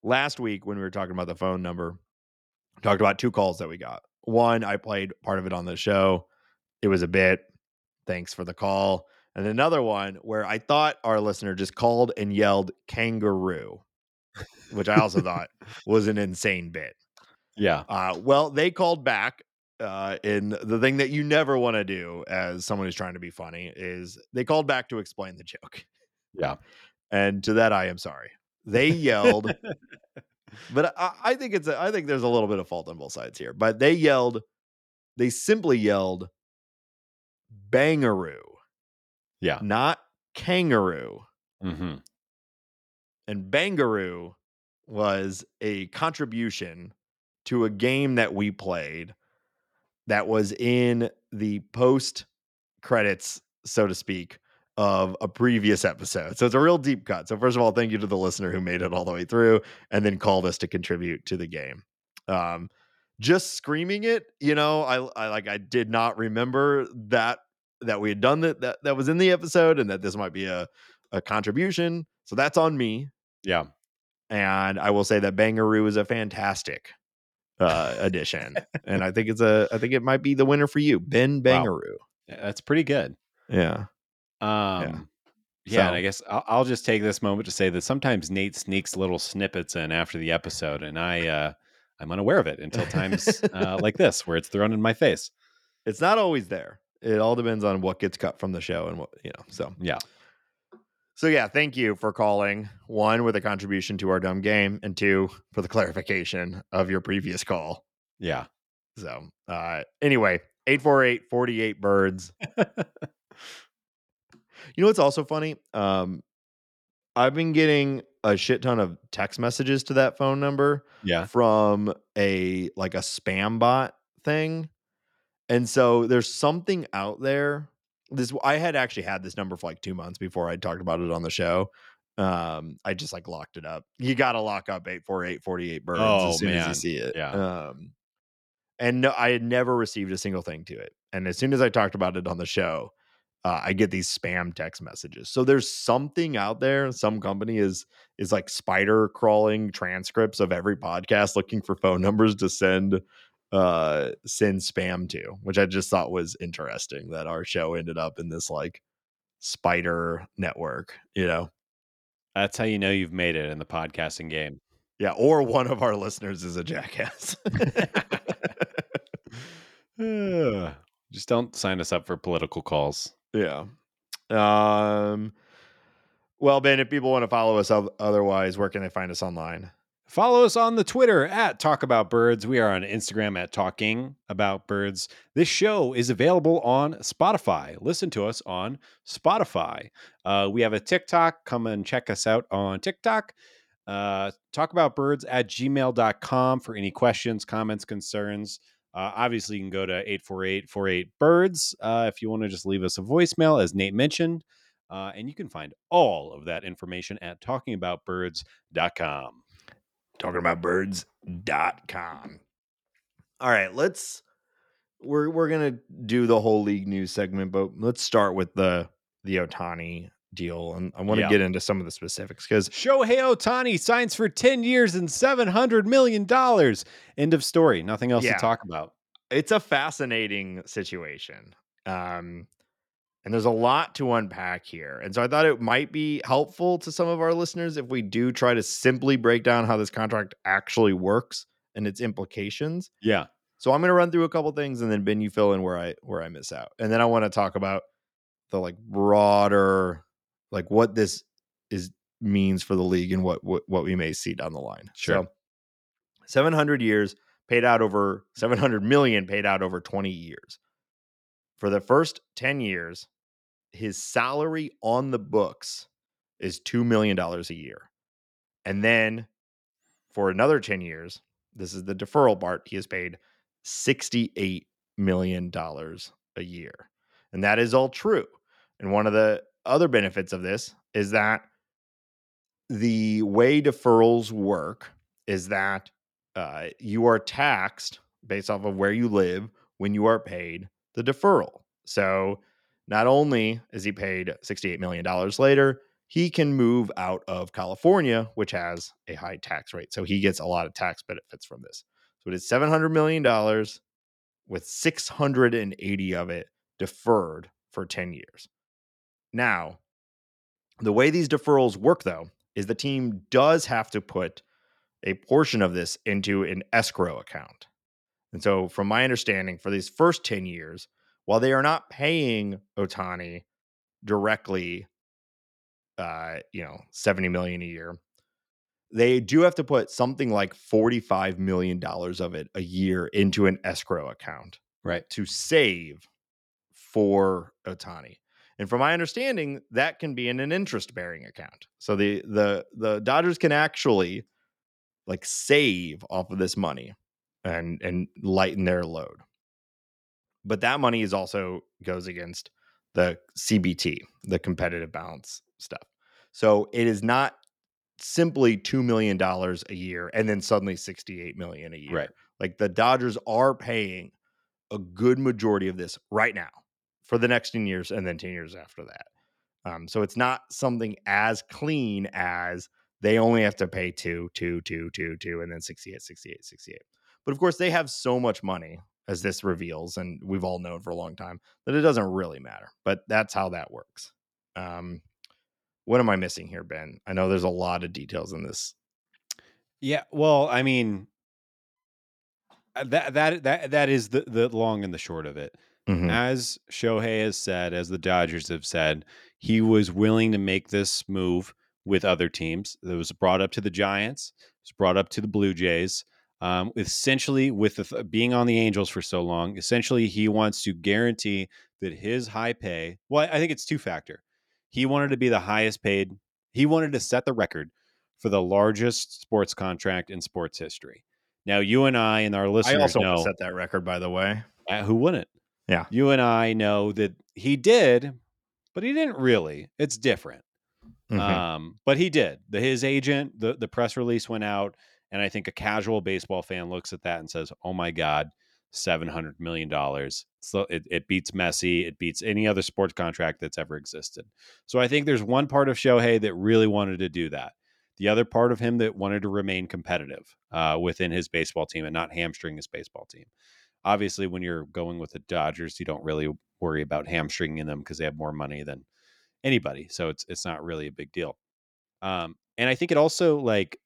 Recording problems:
uneven, jittery; strongly; from 13 s to 7:43

